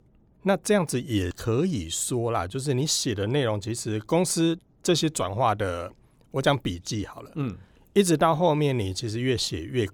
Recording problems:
none

